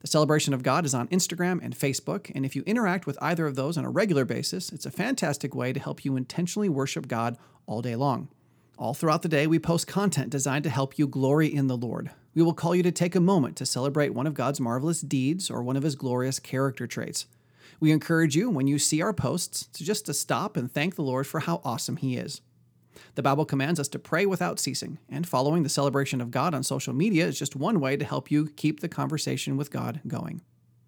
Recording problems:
none

